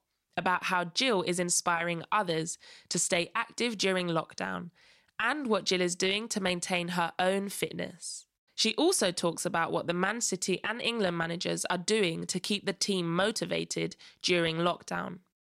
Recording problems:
none

